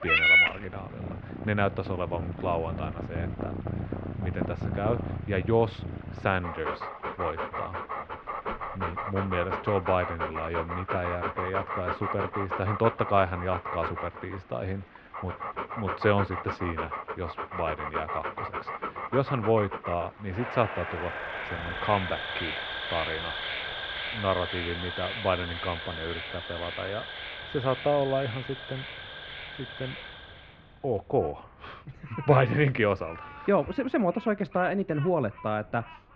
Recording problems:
muffled; very; fading above 2.5 kHz
animal sounds; loud; throughout; 2 dB below the speech
rain or running water; faint; throughout; 25 dB below the speech

